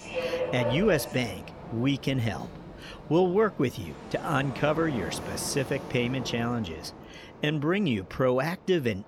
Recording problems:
train or aircraft noise; loud; throughout; 10 dB below the speech

